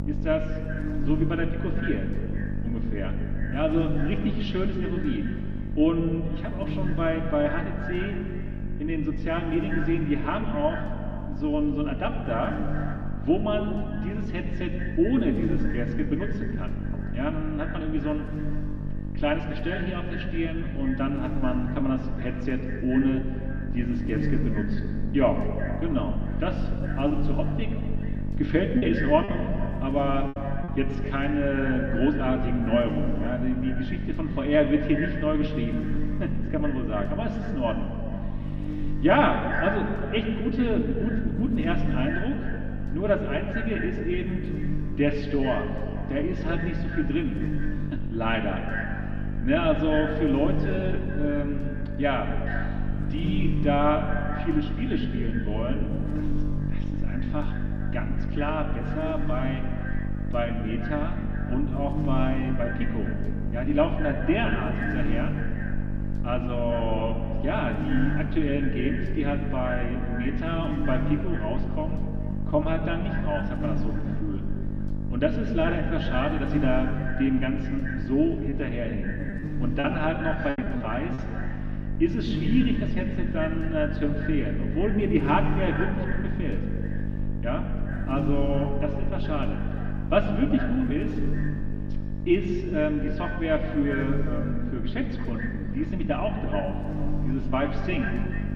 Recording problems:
echo of what is said; noticeable; throughout; 210 ms later, 15 dB below the speech
muffled; slightly; fading above 3.5 kHz
room echo; slight; dies away in 2.2 s
off-mic speech; somewhat distant
electrical hum; noticeable; throughout; 50 Hz, 10 dB below the speech
choppy; very; from 27 to 29 s and from 1:19 to 1:21; 7% of the speech affected

